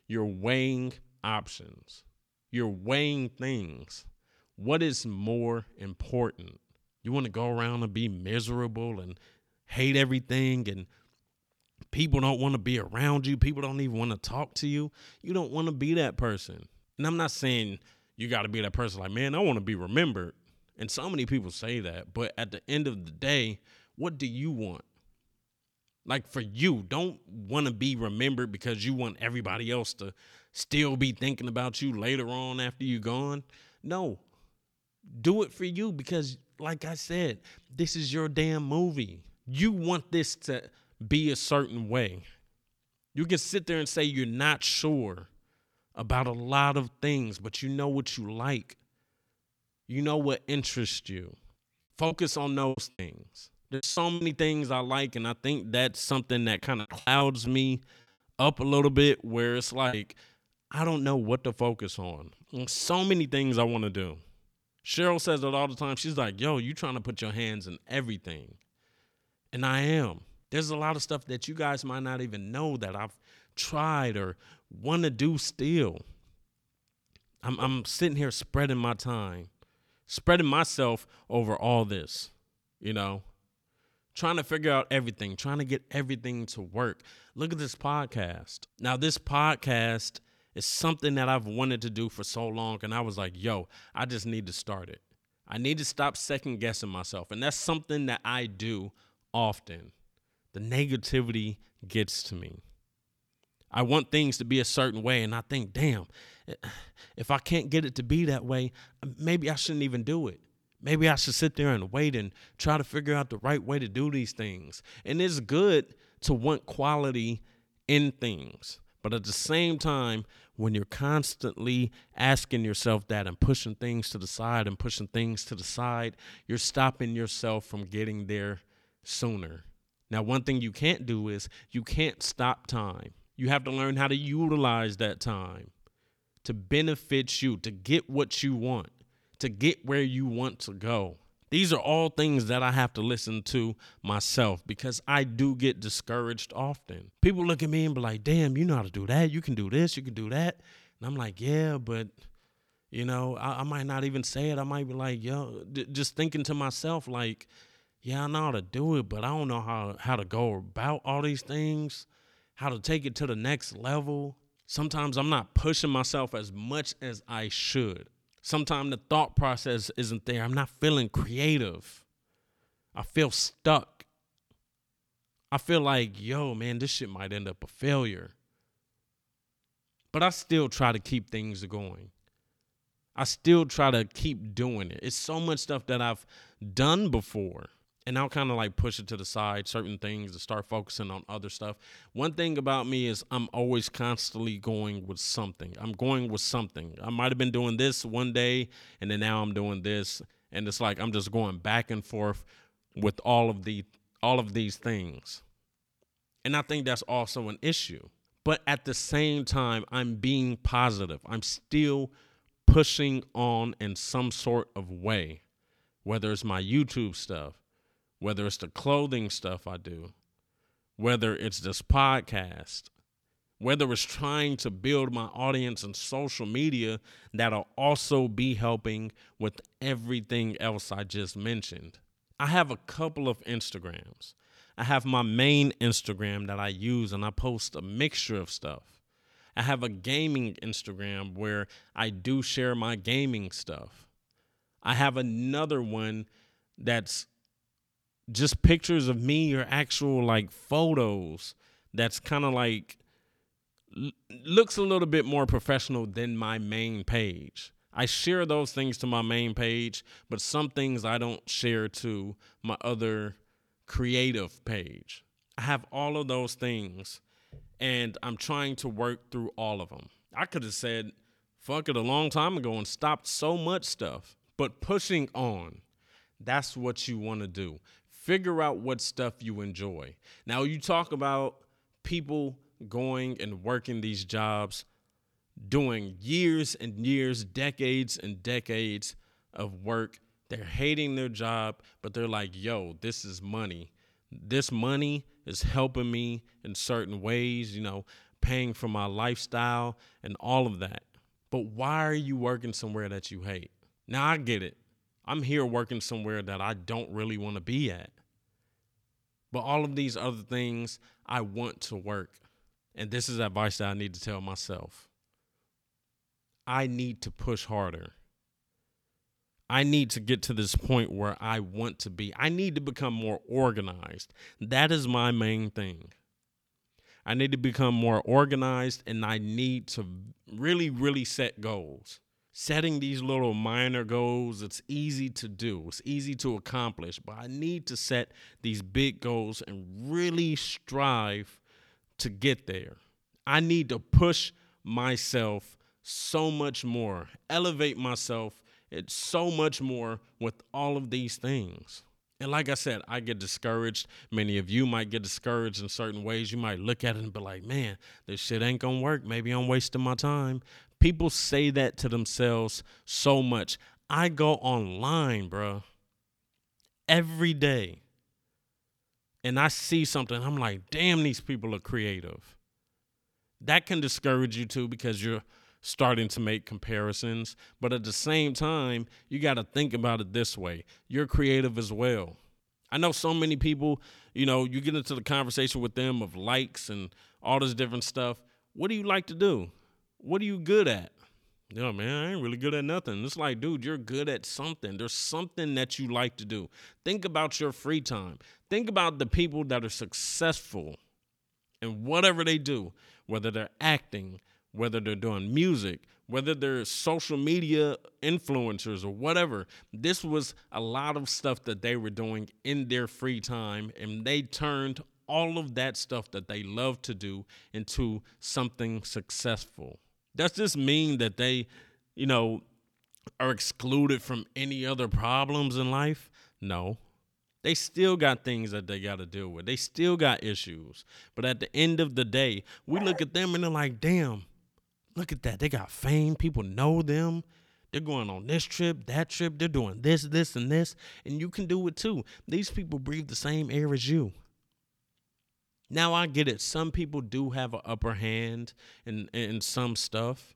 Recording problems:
choppy; very; from 52 to 54 s and from 57 s to 1:00; 12% of the speech affected
dog barking; noticeable; at 7:13; peak 9 dB below the speech

